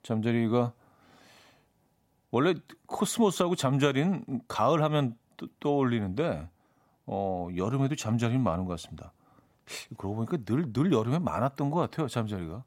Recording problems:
none

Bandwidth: 16 kHz